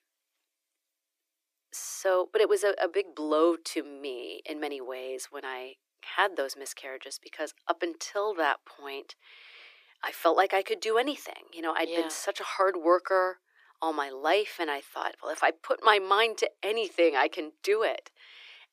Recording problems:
thin; very; fading below 350 Hz

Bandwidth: 15 kHz